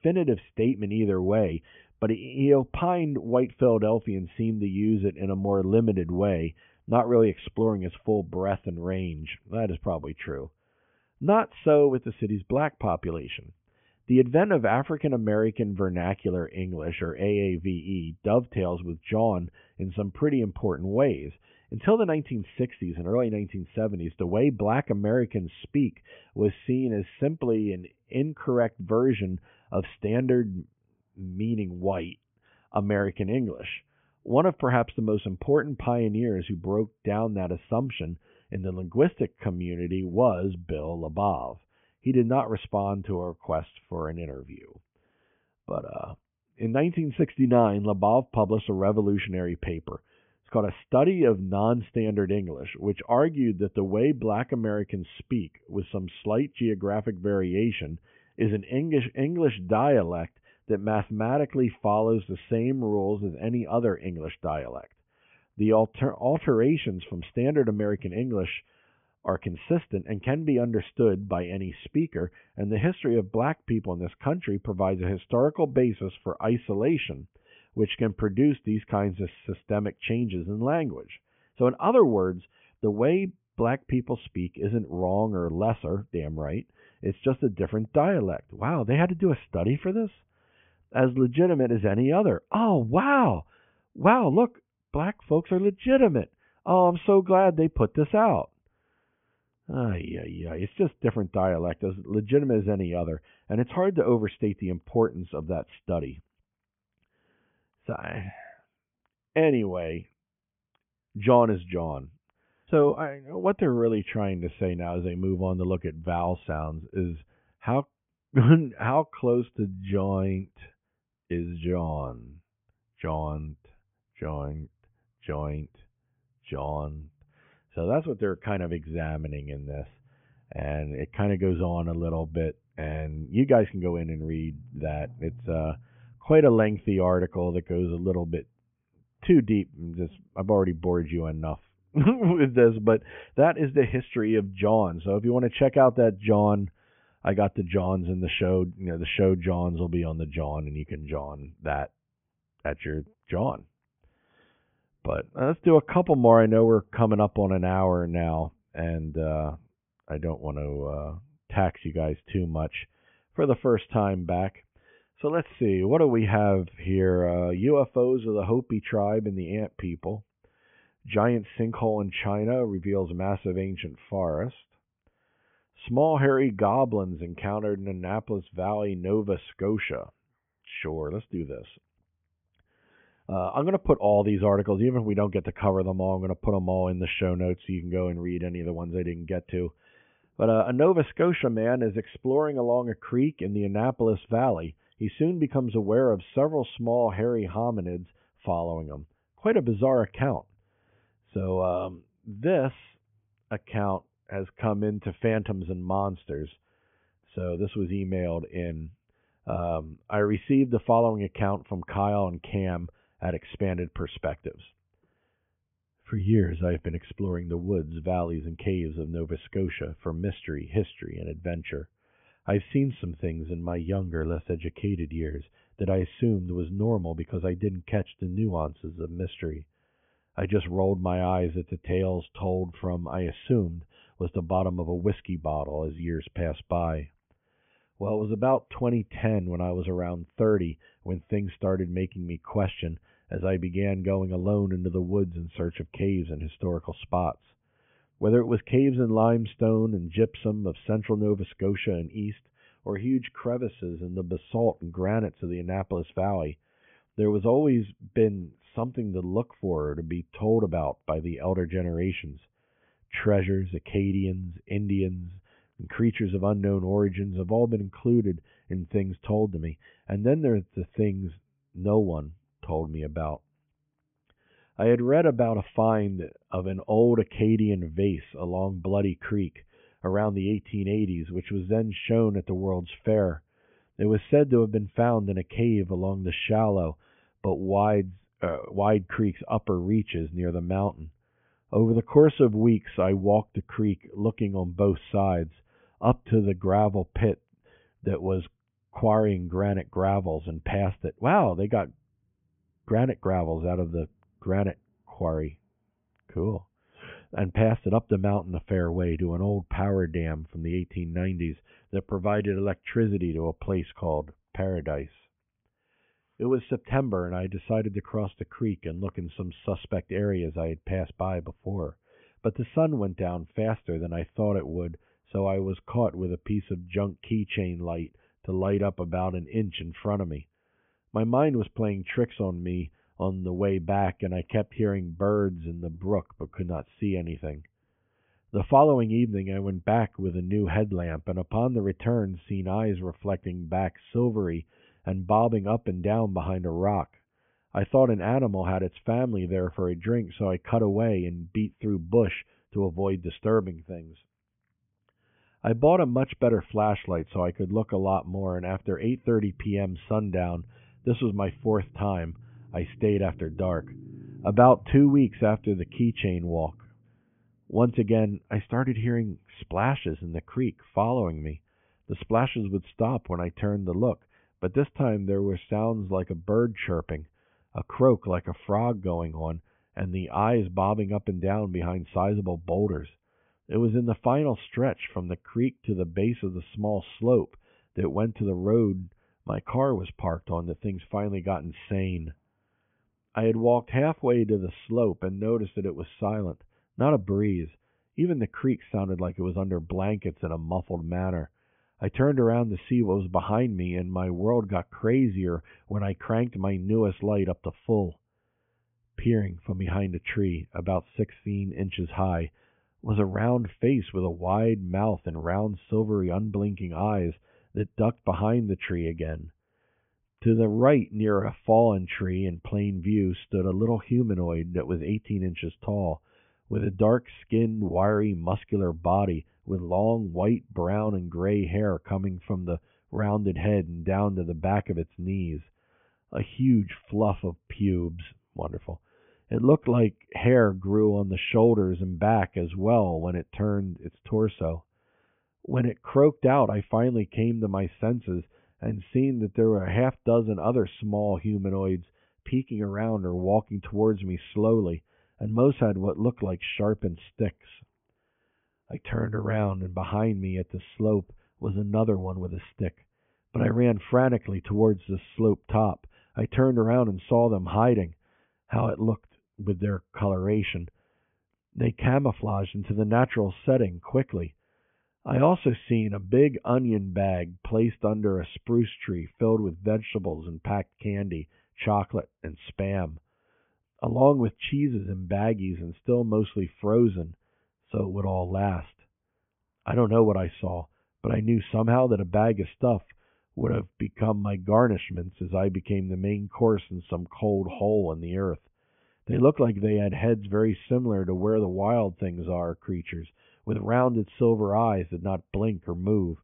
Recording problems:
high frequencies cut off; severe; nothing above 3.5 kHz

